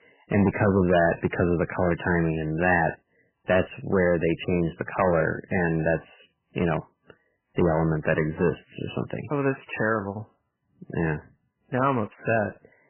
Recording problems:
garbled, watery; badly; nothing above 3 kHz
distortion; slight; 2% of the sound clipped

